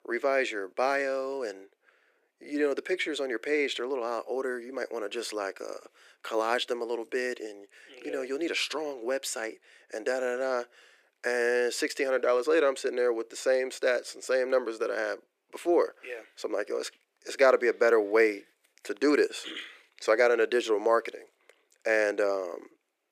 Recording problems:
thin; somewhat; fading below 350 Hz

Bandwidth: 14.5 kHz